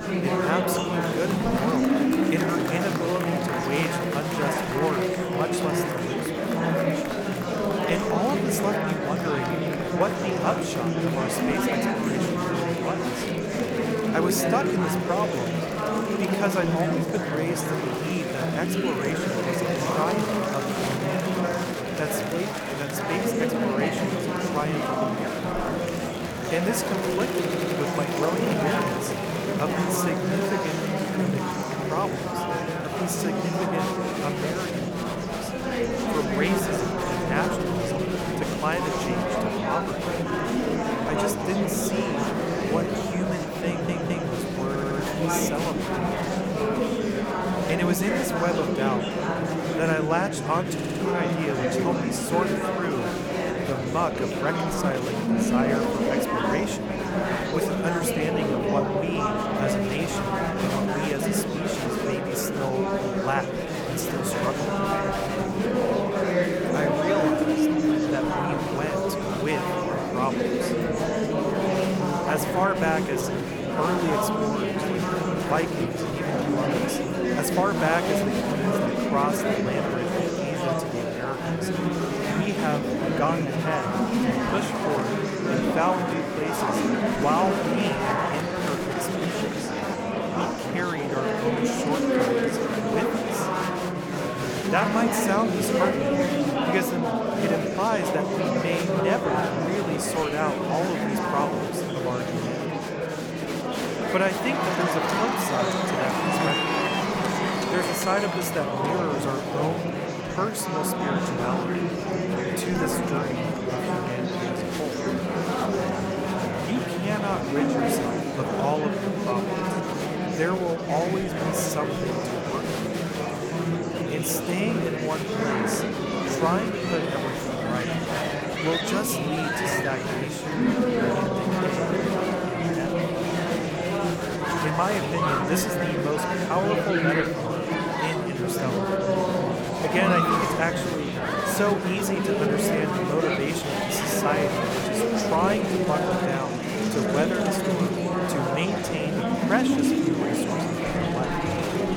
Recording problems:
murmuring crowd; very loud; throughout; 4 dB above the speech
audio stuttering; 4 times, first at 27 s

